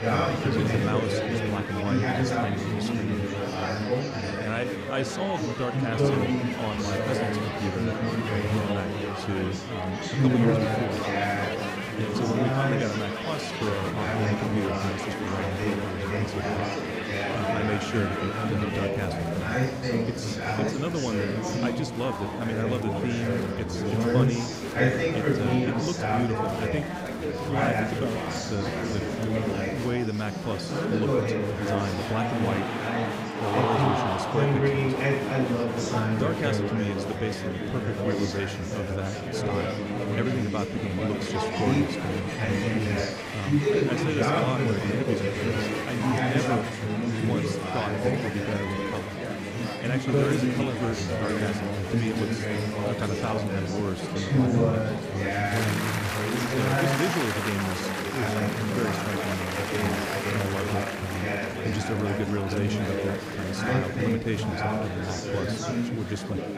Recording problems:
murmuring crowd; very loud; throughout; 4 dB above the speech

